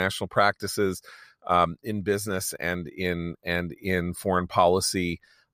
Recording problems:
abrupt cut into speech; at the start

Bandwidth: 15 kHz